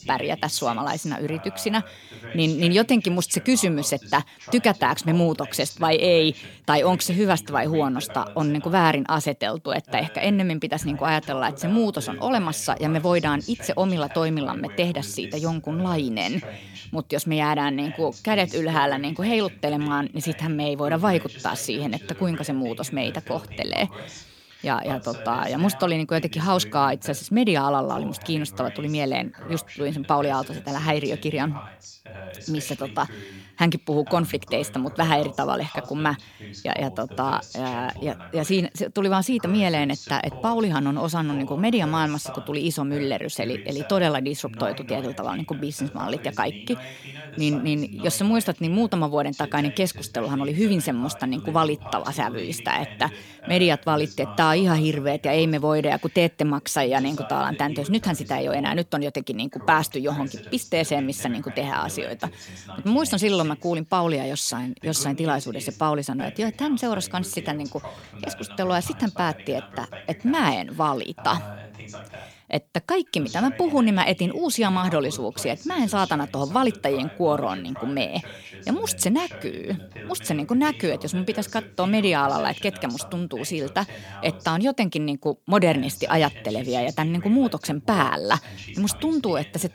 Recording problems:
voice in the background; noticeable; throughout; 15 dB below the speech

